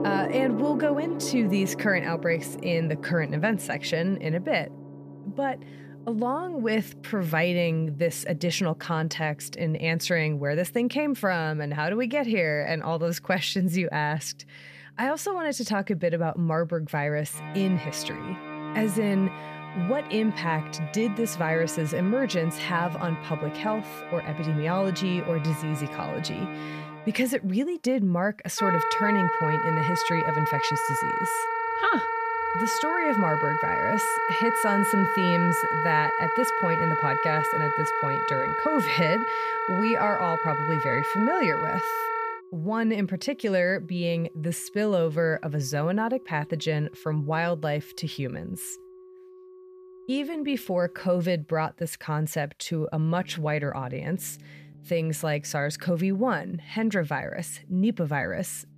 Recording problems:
background music; loud; throughout; 1 dB below the speech

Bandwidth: 14.5 kHz